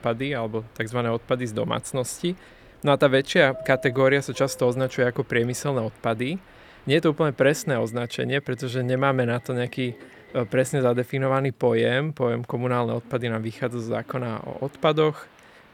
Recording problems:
train or aircraft noise; faint; throughout; 25 dB below the speech

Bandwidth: 19 kHz